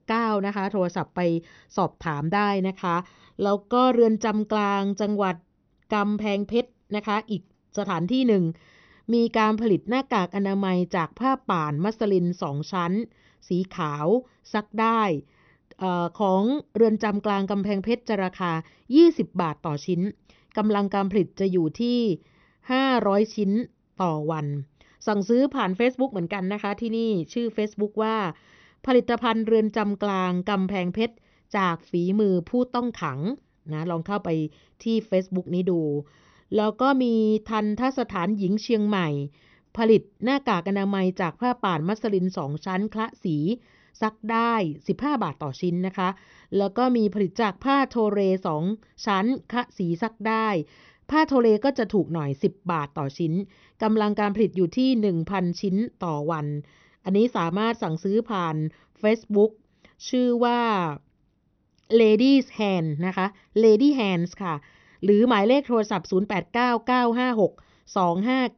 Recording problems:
high frequencies cut off; noticeable; nothing above 6 kHz

